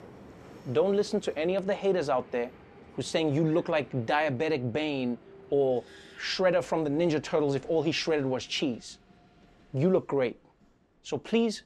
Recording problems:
train or aircraft noise; faint; throughout; 25 dB below the speech

